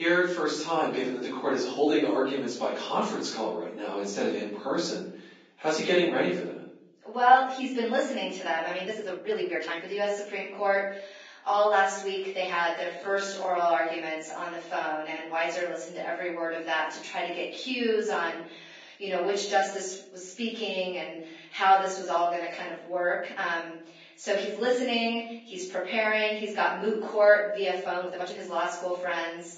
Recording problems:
off-mic speech; far
garbled, watery; badly; nothing above 7.5 kHz
room echo; noticeable; dies away in 0.6 s
thin; somewhat; fading below 250 Hz
abrupt cut into speech; at the start
uneven, jittery; strongly; from 9 to 28 s

